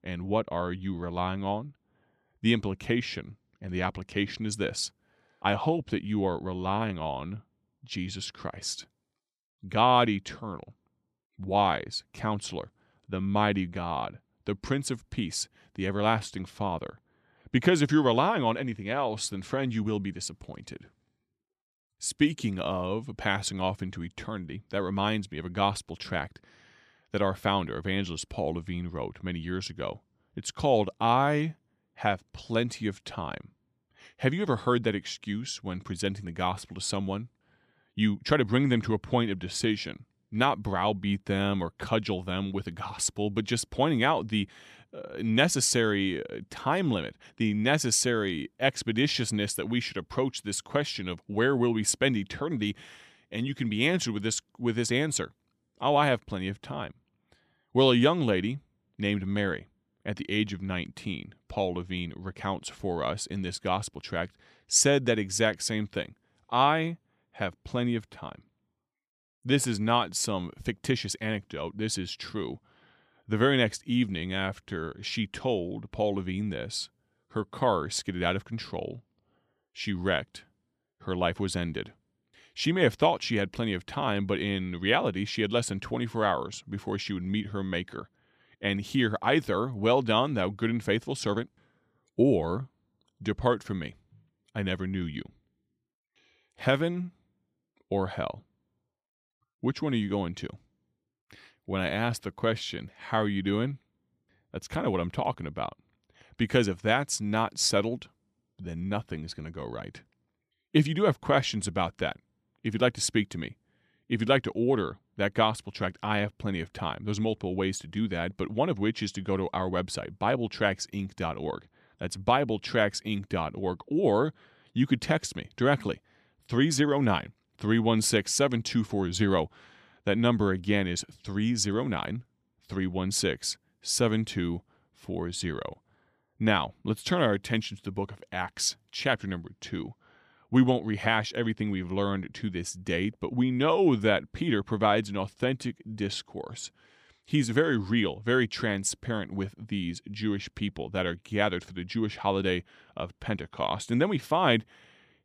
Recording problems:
none

